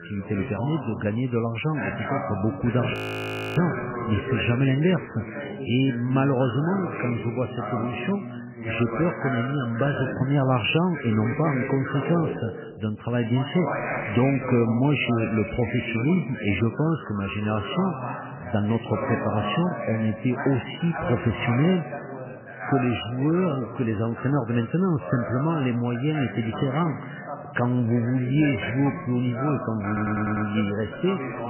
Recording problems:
garbled, watery; badly; nothing above 3 kHz
background chatter; loud; throughout; 2 voices, 7 dB below the speech
audio freezing; at 3 s for 0.5 s
audio stuttering; at 30 s

